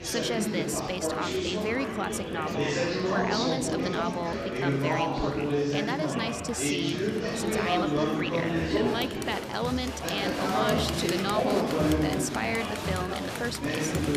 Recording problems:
murmuring crowd; very loud; throughout; 3 dB above the speech

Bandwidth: 14.5 kHz